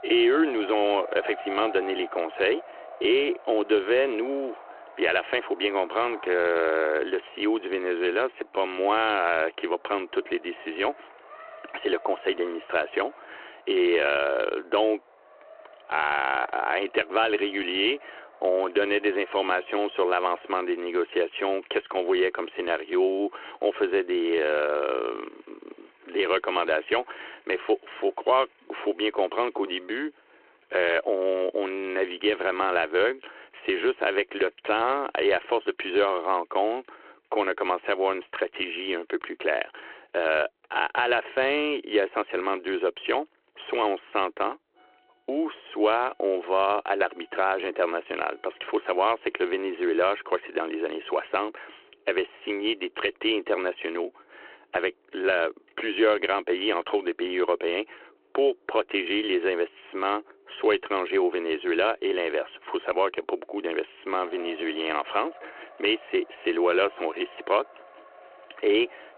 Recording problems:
phone-call audio
traffic noise; faint; throughout; 20 dB below the speech

